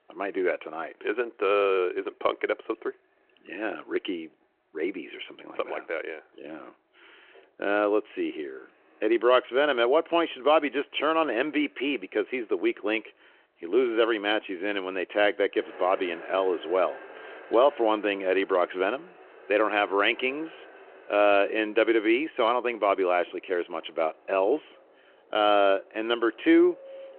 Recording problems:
phone-call audio
traffic noise; faint; throughout; 25 dB below the speech

